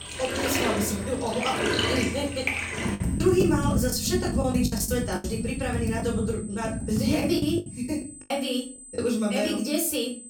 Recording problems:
off-mic speech; far
room echo; slight; dies away in 0.3 s
household noises; loud; until 7.5 s; 1 dB below the speech
high-pitched whine; noticeable; throughout; 8 kHz, 15 dB below the speech
choppy; very; from 3 to 6 s and from 7 to 9 s; 13% of the speech affected

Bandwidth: 17.5 kHz